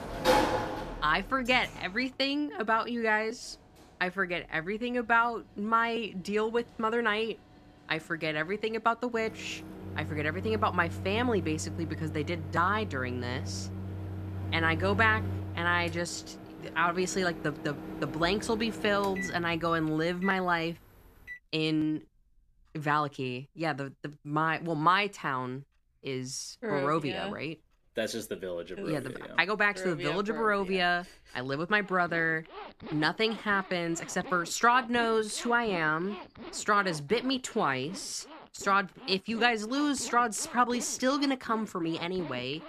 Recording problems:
household noises; loud; throughout; 10 dB below the speech

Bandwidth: 14.5 kHz